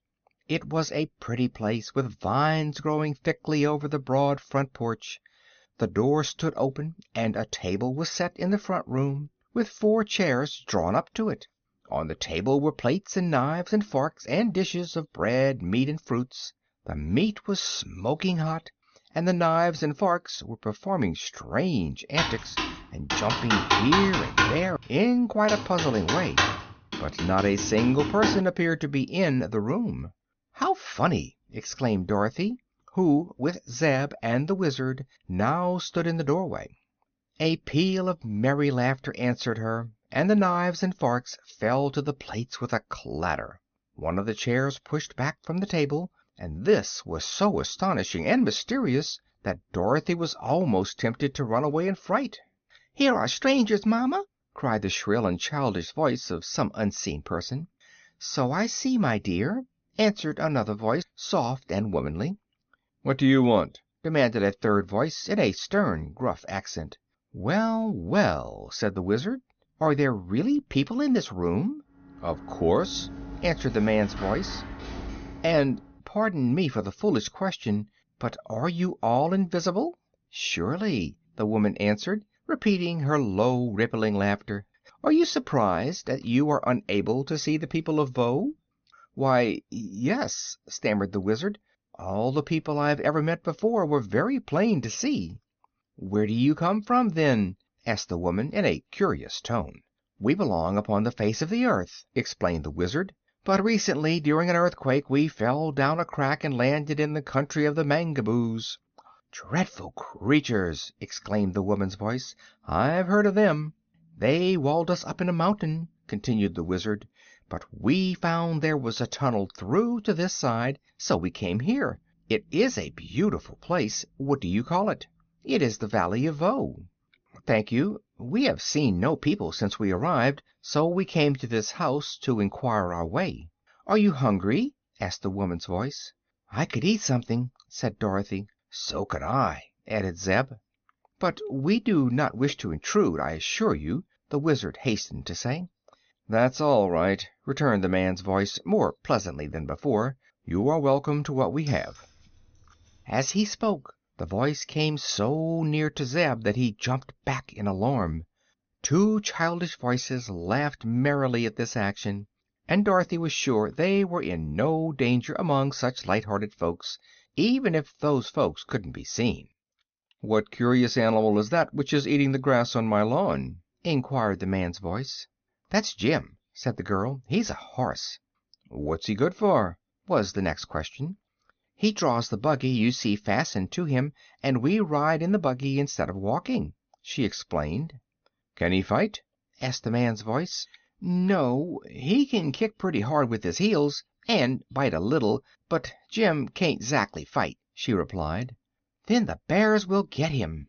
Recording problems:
high frequencies cut off; noticeable; nothing above 6.5 kHz
keyboard typing; loud; from 22 to 28 s; peak 5 dB above the speech
door banging; noticeable; from 1:12 to 1:16; peak 9 dB below the speech
jangling keys; faint; from 2:32 to 2:33; peak 15 dB below the speech

